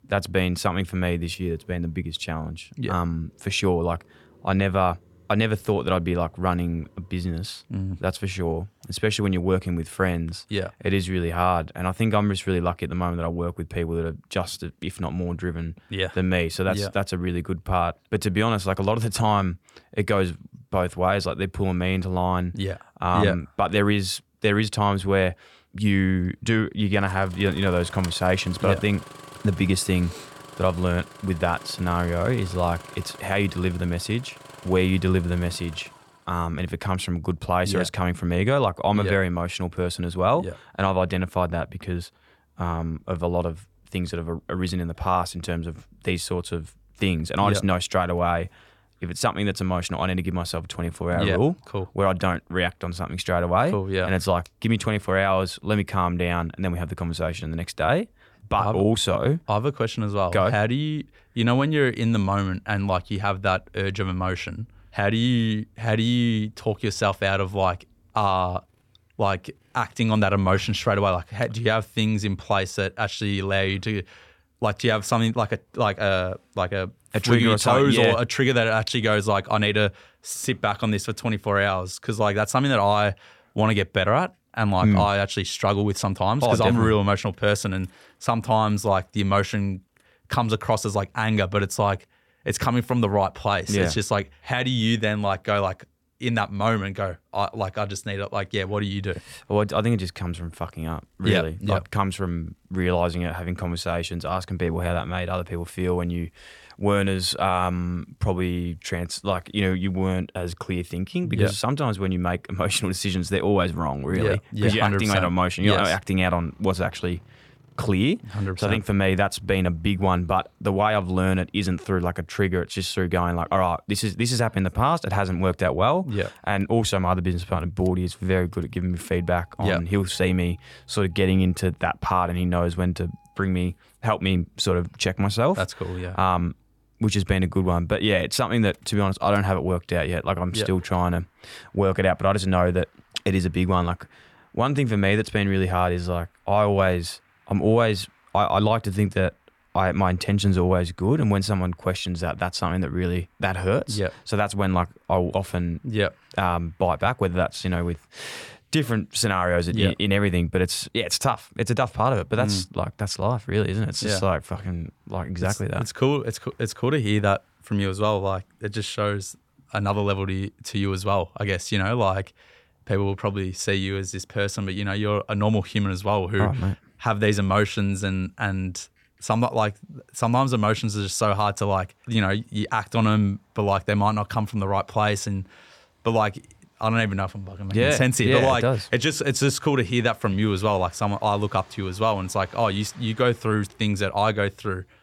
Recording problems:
traffic noise; faint; throughout; 30 dB below the speech

